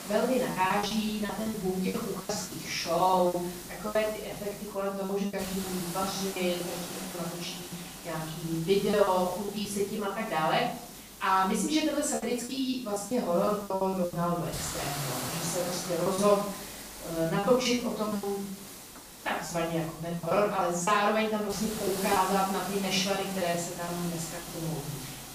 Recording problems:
off-mic speech; far
room echo; noticeable; dies away in 0.6 s
hiss; noticeable; throughout; 10 dB below the speech
choppy; very; 13% of the speech affected

